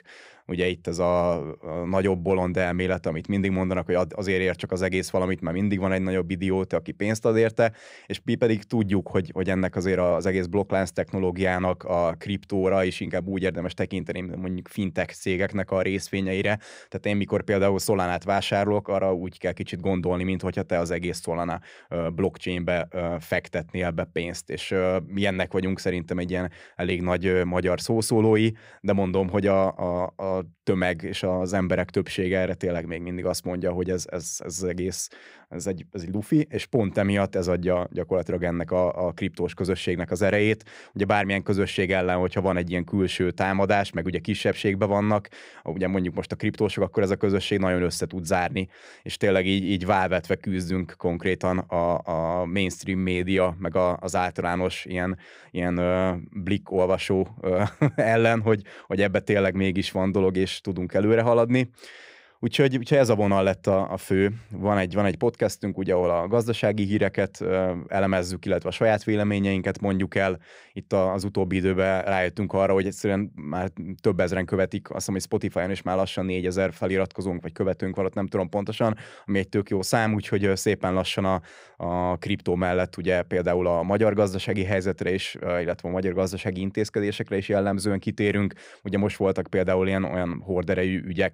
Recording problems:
none

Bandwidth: 15.5 kHz